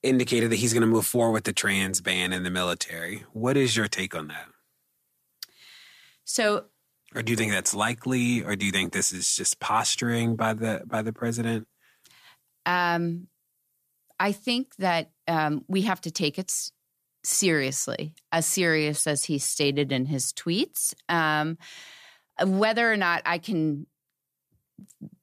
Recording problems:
none

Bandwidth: 14.5 kHz